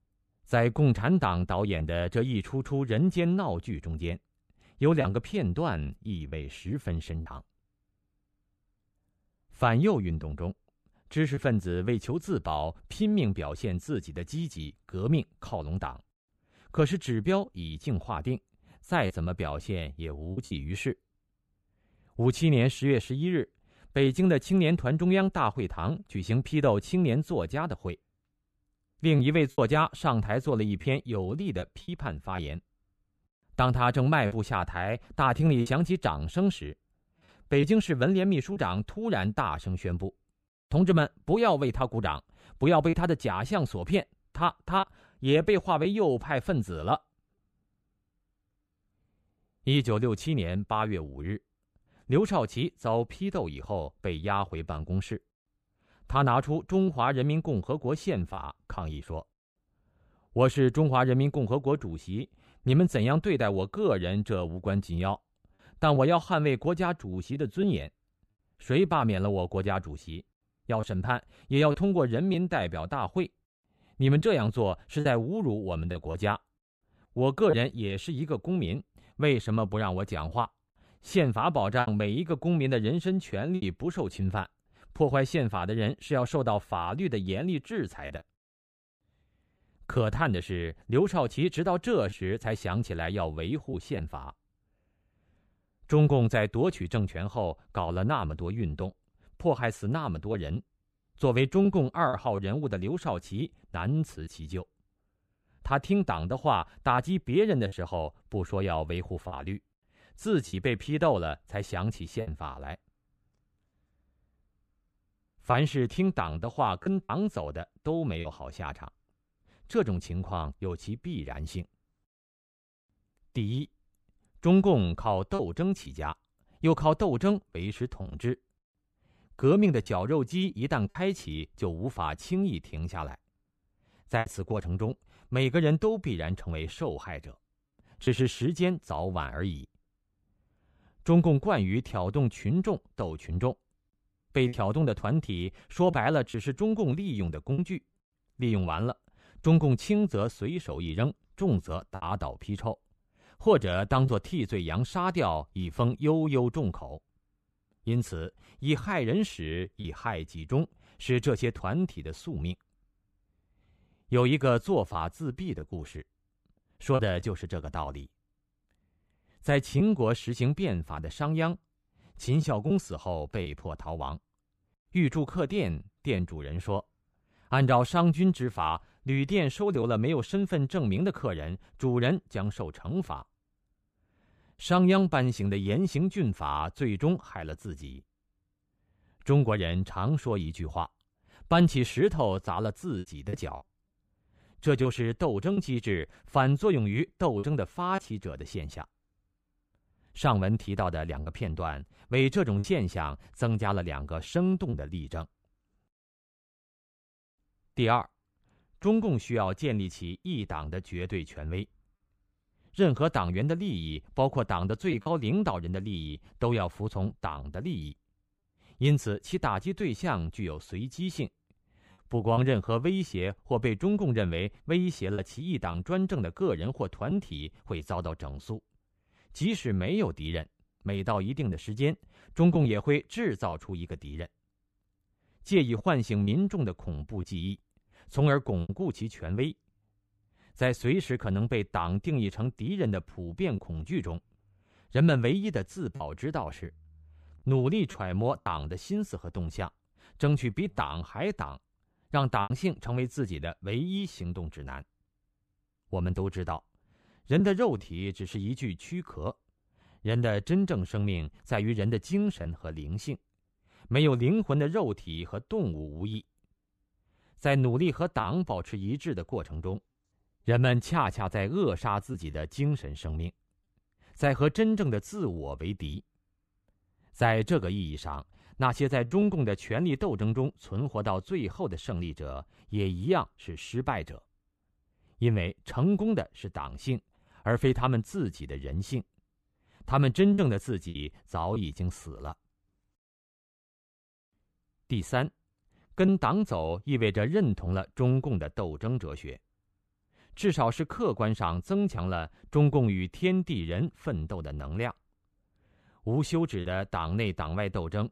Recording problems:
choppy; occasionally; 2% of the speech affected

